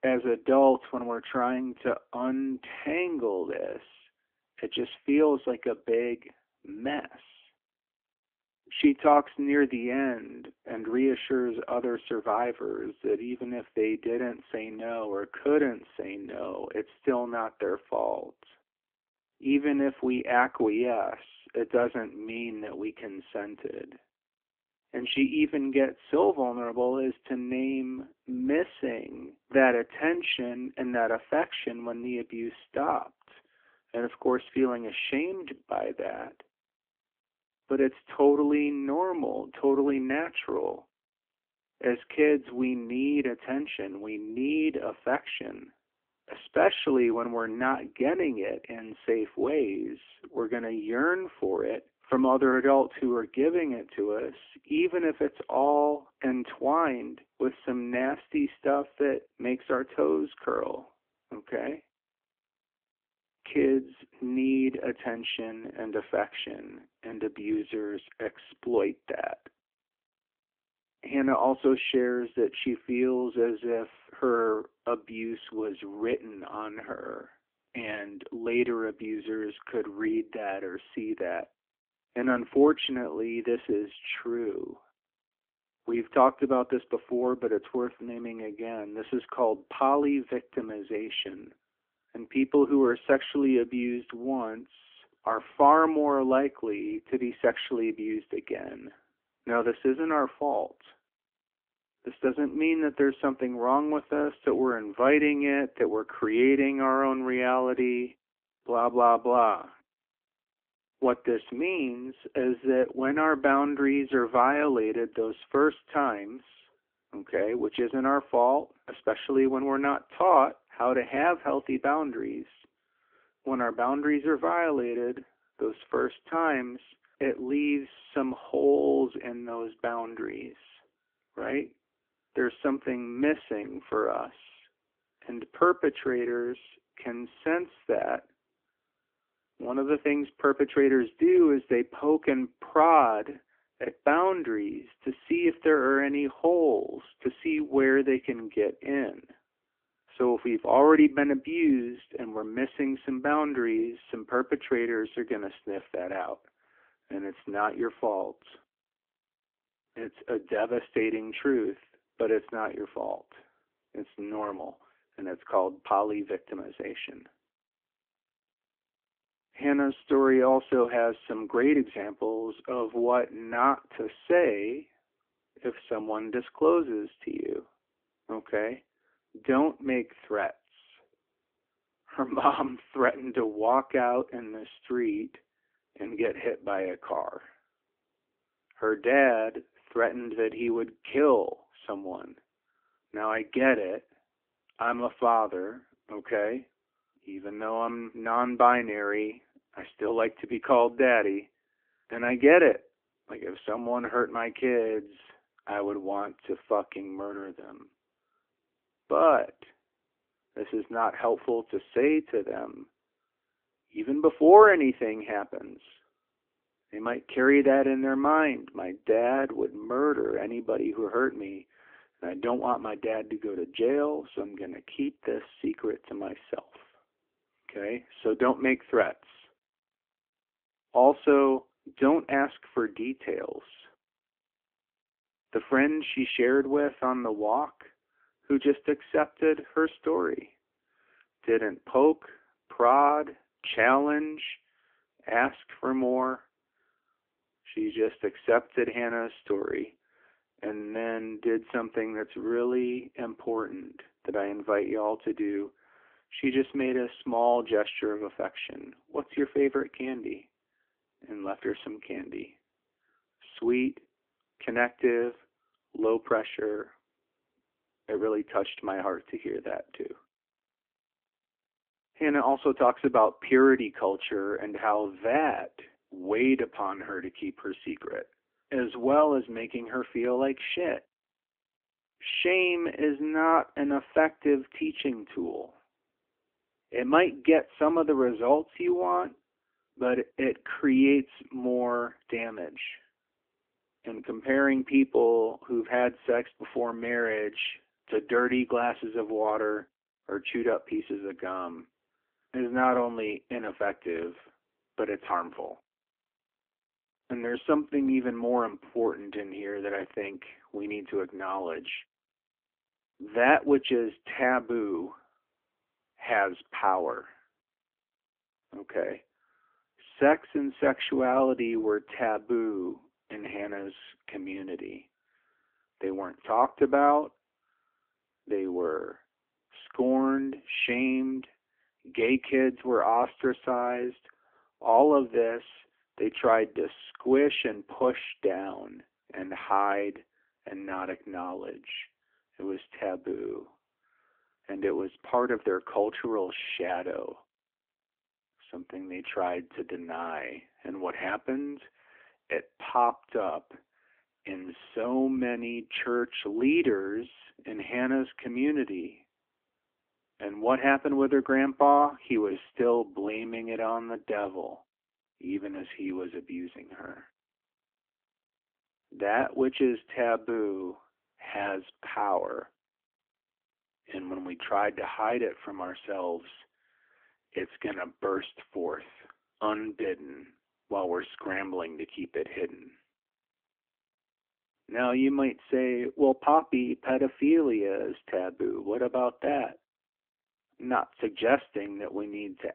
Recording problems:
phone-call audio; nothing above 3.5 kHz

